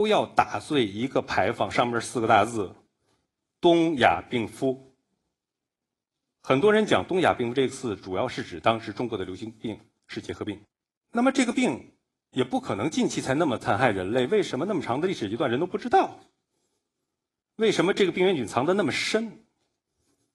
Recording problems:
garbled, watery; slightly
abrupt cut into speech; at the start

